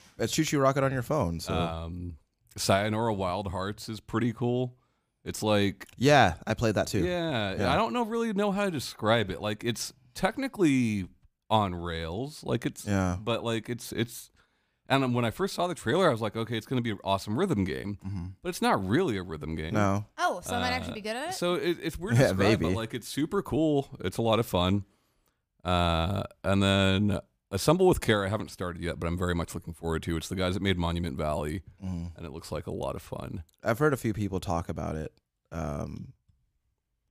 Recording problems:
none

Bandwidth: 15 kHz